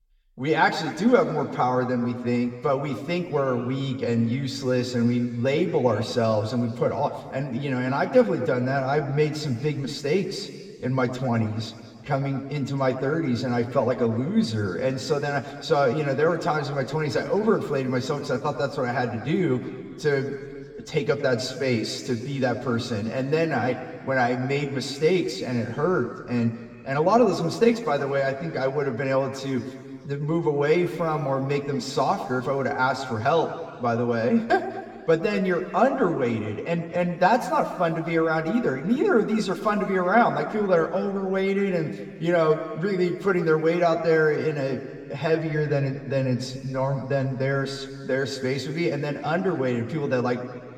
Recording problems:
room echo; slight; dies away in 2 s
off-mic speech; somewhat distant

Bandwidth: 17.5 kHz